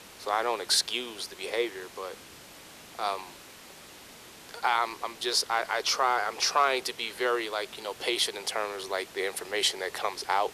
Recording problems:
thin; very; fading below 400 Hz
hiss; noticeable; throughout; 20 dB below the speech

